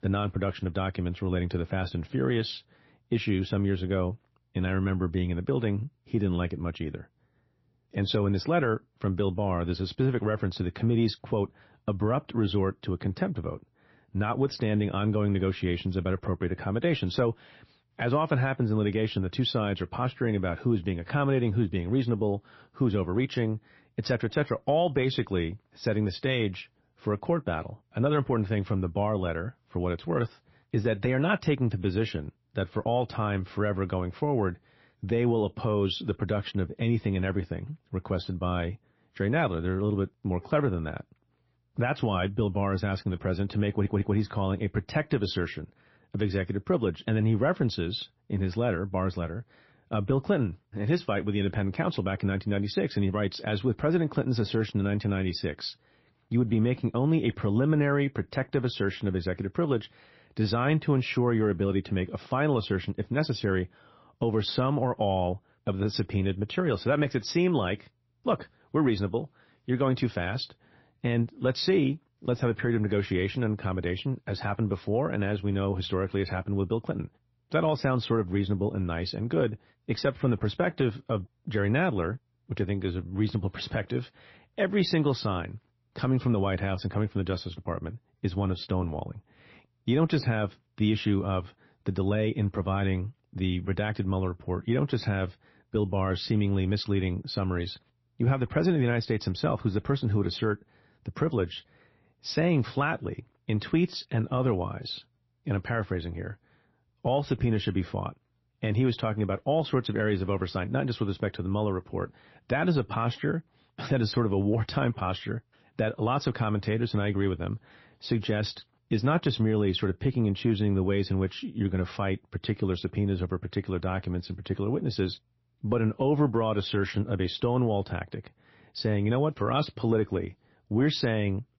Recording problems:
garbled, watery; slightly; nothing above 5.5 kHz
audio stuttering; at 44 s

